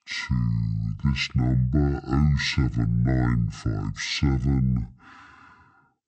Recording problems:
wrong speed and pitch; too slow and too low; 0.5 times normal speed

